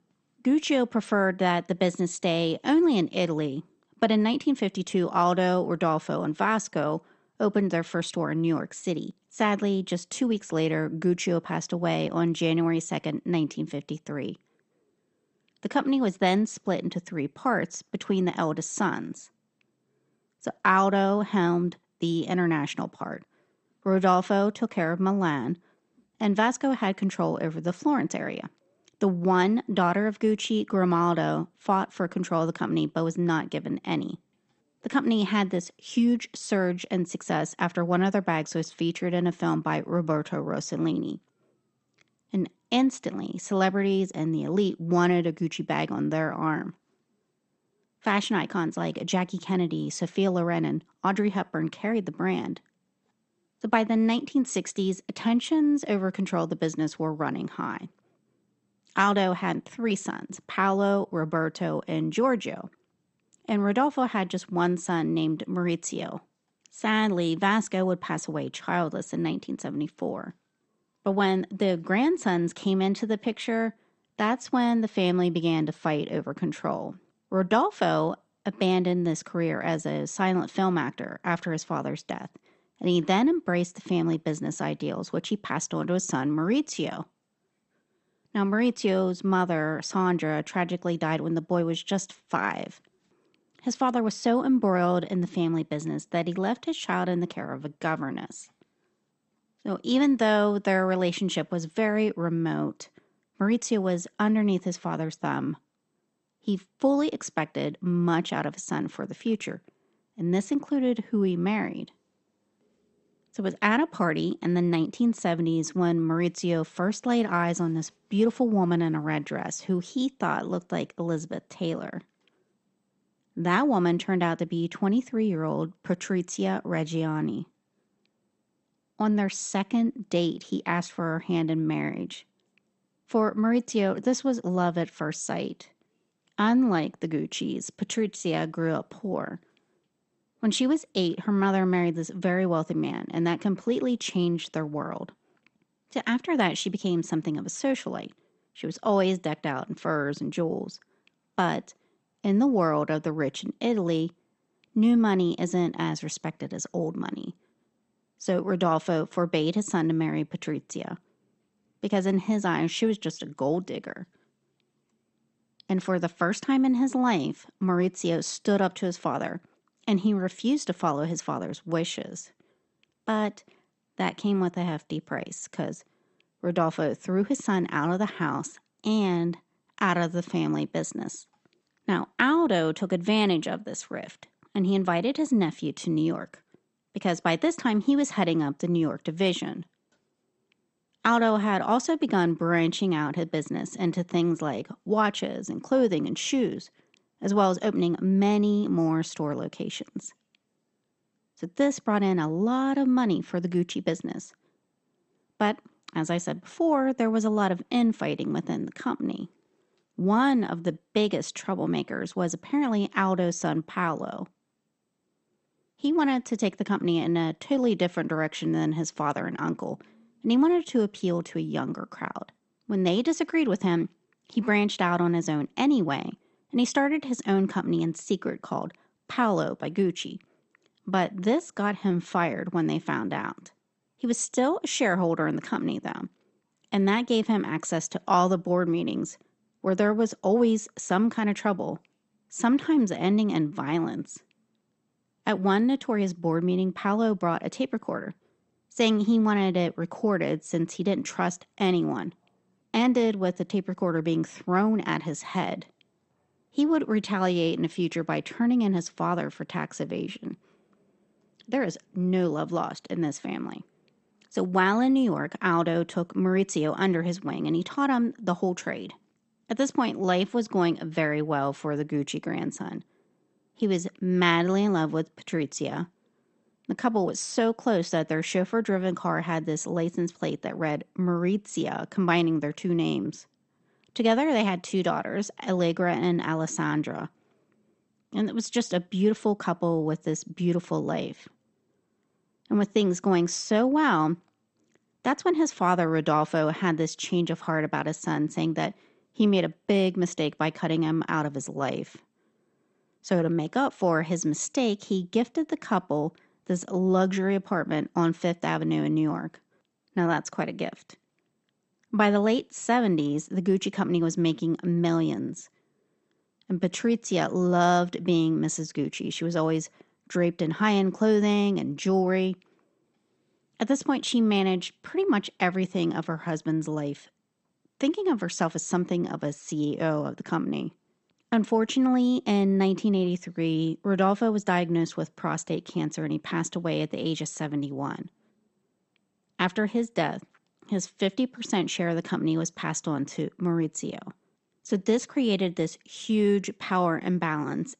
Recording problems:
garbled, watery; slightly; nothing above 8 kHz

